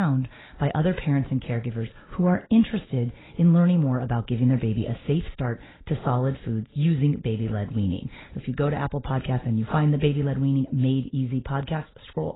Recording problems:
garbled, watery; badly; nothing above 4 kHz
abrupt cut into speech; at the start

